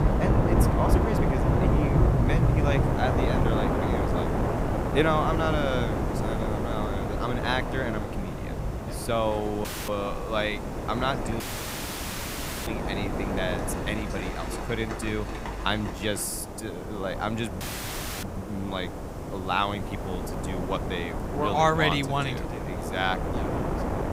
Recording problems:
wind noise on the microphone; heavy; 4 dB below the speech
rain or running water; loud; until 16 s; as loud as the speech
hiss; faint; throughout; 20 dB below the speech
audio cutting out; at 9.5 s, at 11 s for 1.5 s and at 18 s for 0.5 s

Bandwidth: 15.5 kHz